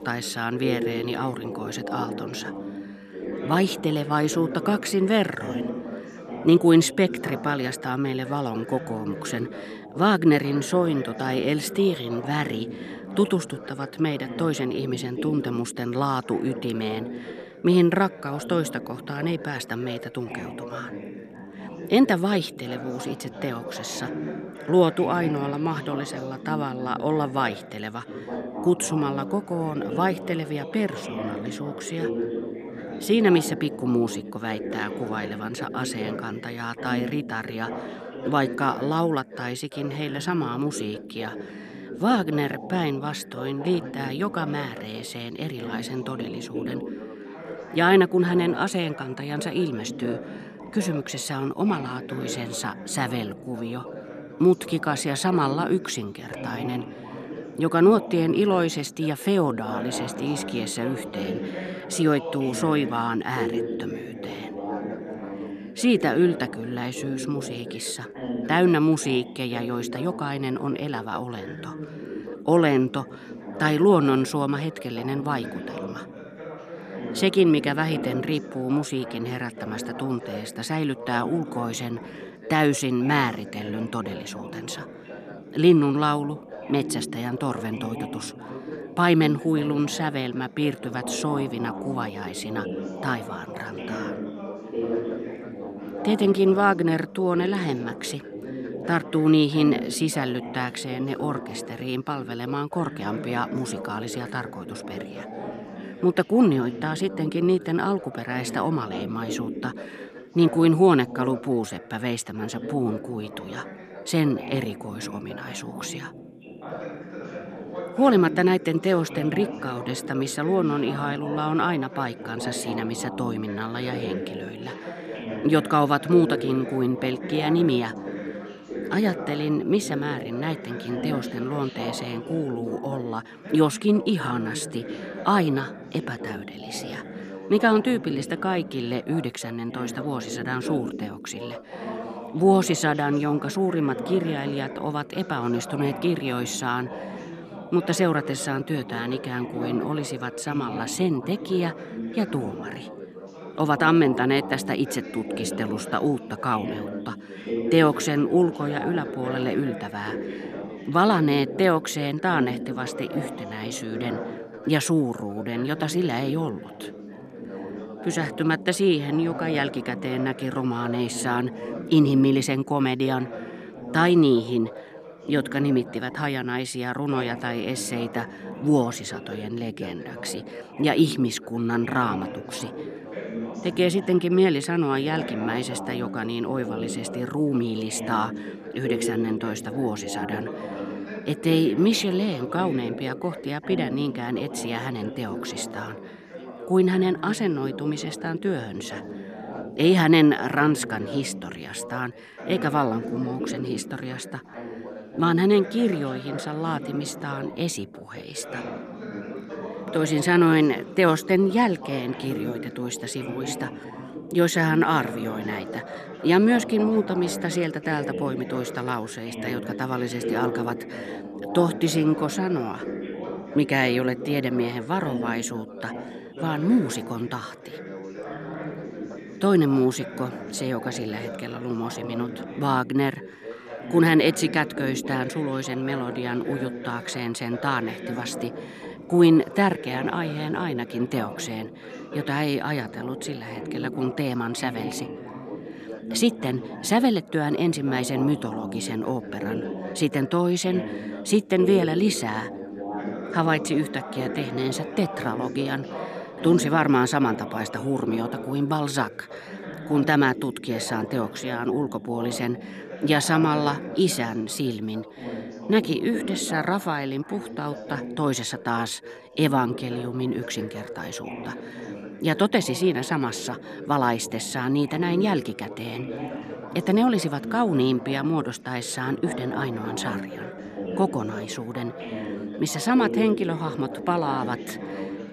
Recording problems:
background chatter; noticeable; throughout; 3 voices, 10 dB below the speech

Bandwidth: 14.5 kHz